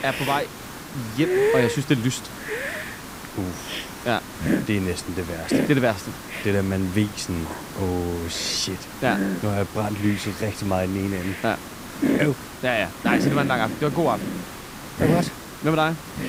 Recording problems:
hiss; loud; throughout; 4 dB below the speech

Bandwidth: 15.5 kHz